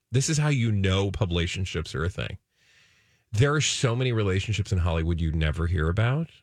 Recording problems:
none

